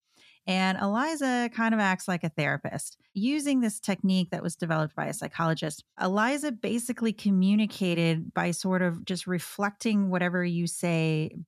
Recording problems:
none

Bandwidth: 14 kHz